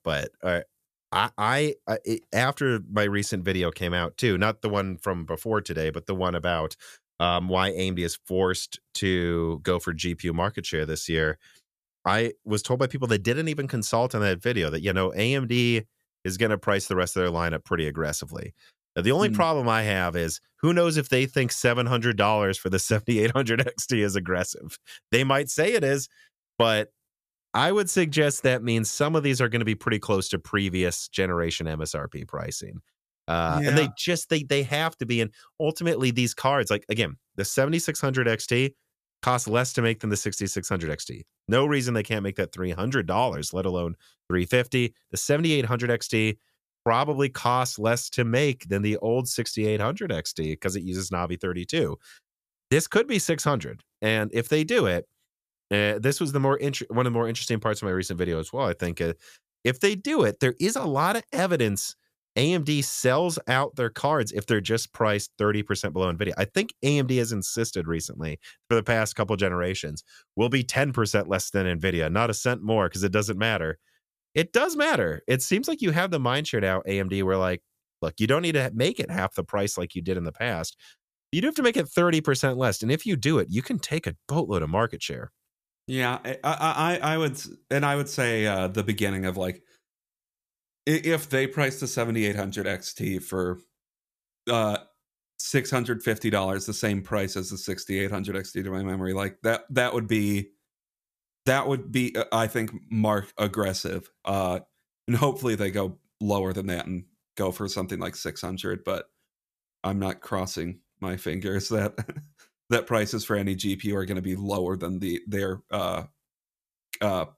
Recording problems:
none

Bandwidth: 14.5 kHz